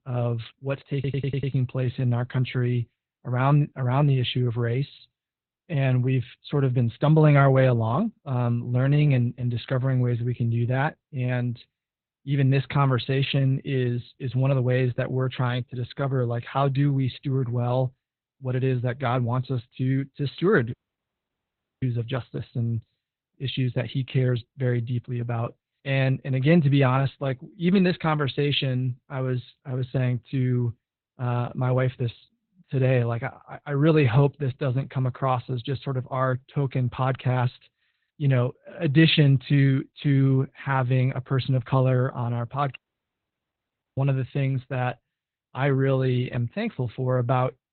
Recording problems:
garbled, watery; badly; nothing above 4 kHz
audio stuttering; at 1 s
audio cutting out; at 21 s for 1 s and at 43 s for 1 s

